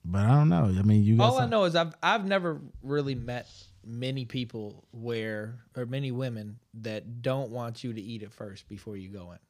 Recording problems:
none

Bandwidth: 15 kHz